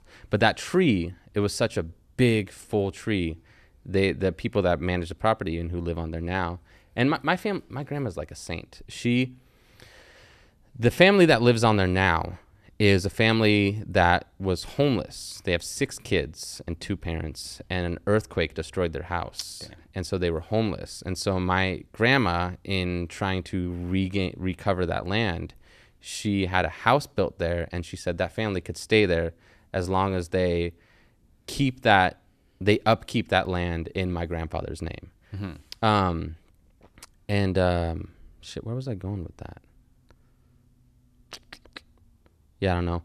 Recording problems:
none

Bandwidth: 14 kHz